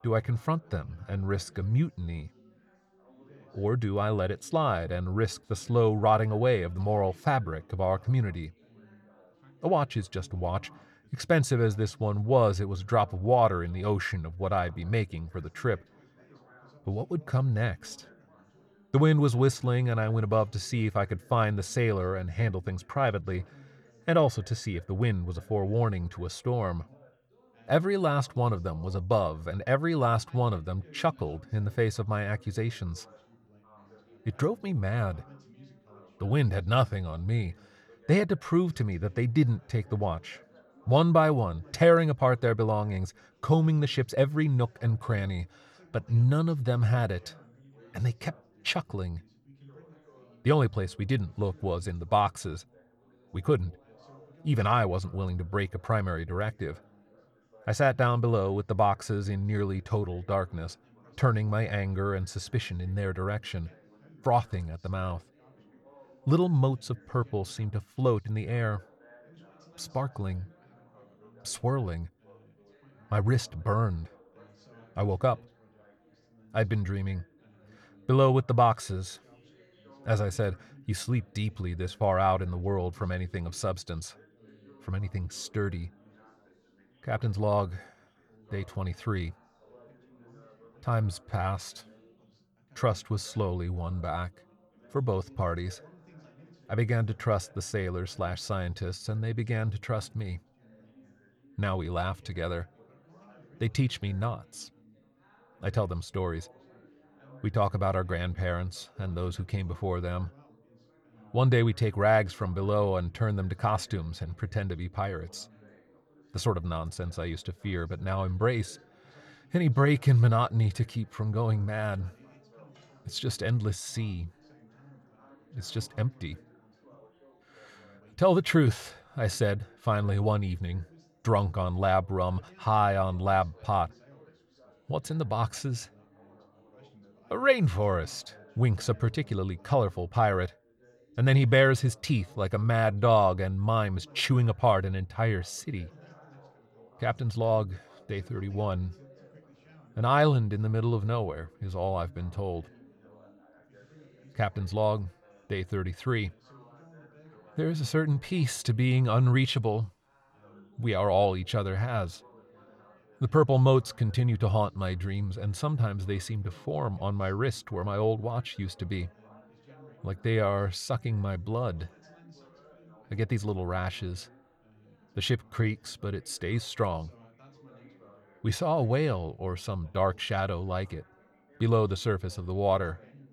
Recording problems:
background chatter; faint; throughout; 3 voices, 30 dB below the speech

